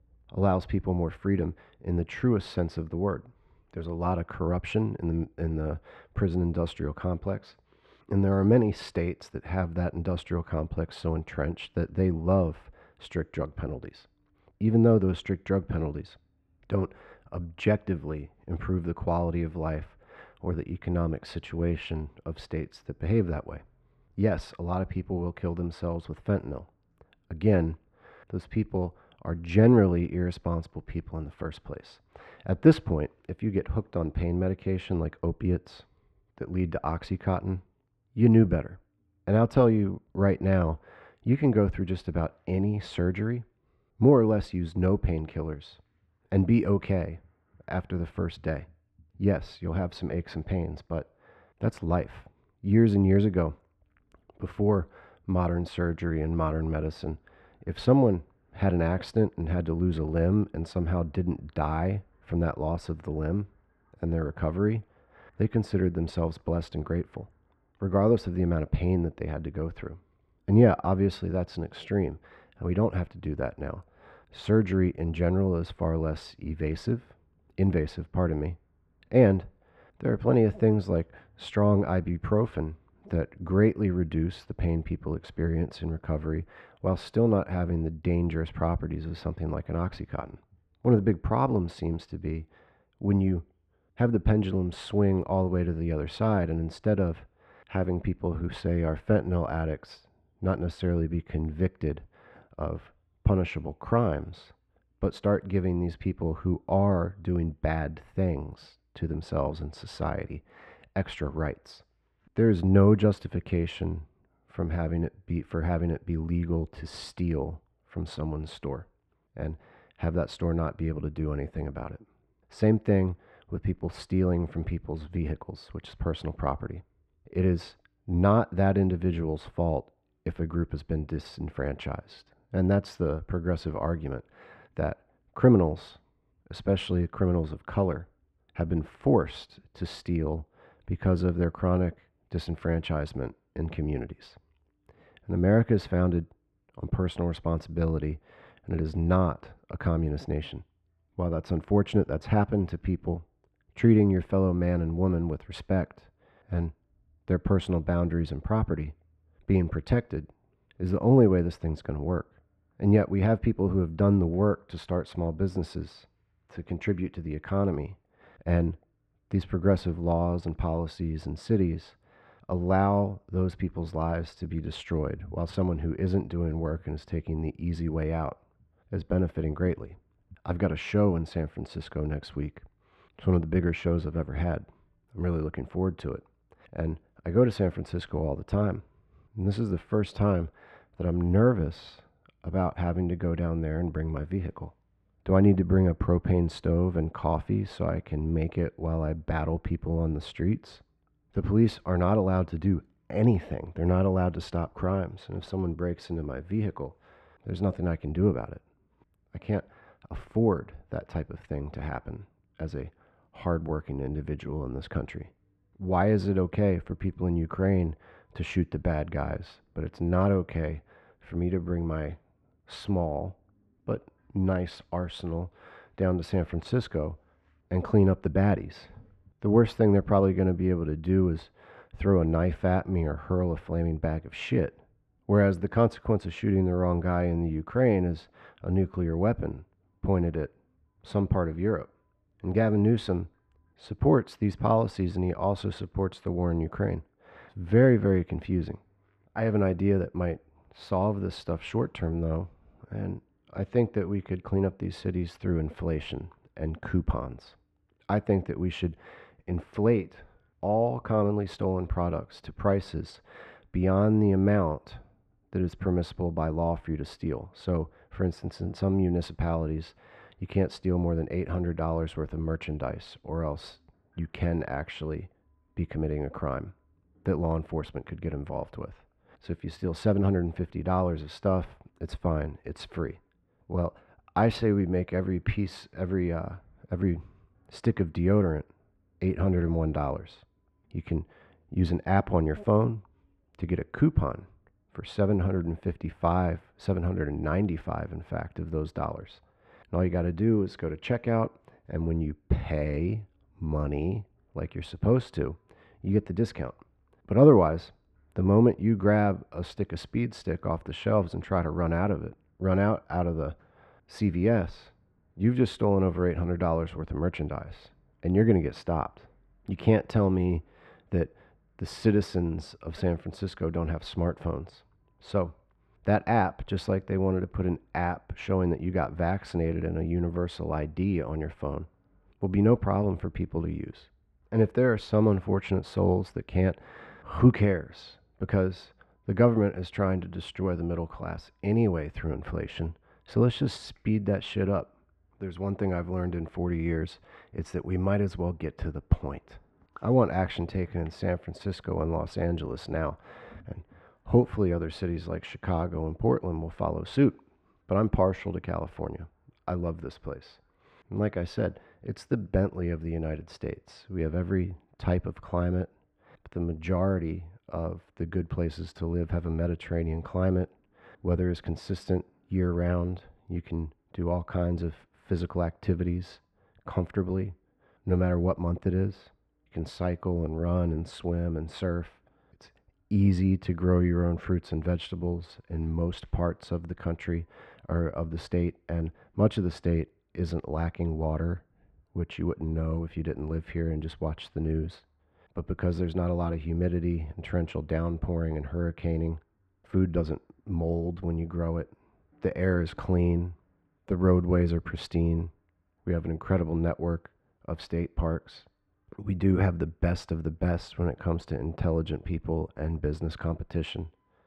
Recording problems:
muffled; very; fading above 2 kHz

